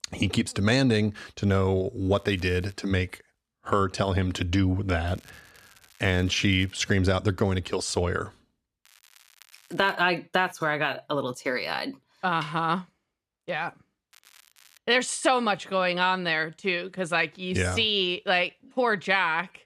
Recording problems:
crackling; faint; 4 times, first at 2 s; 30 dB below the speech

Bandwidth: 14.5 kHz